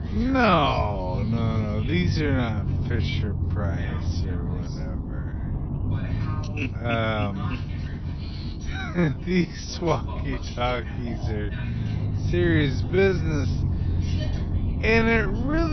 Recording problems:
wrong speed, natural pitch; too slow; 0.5 times normal speed
high frequencies cut off; noticeable; nothing above 6 kHz
background chatter; noticeable; throughout; 2 voices, 20 dB below the speech
low rumble; noticeable; throughout; 15 dB below the speech
abrupt cut into speech; at the end

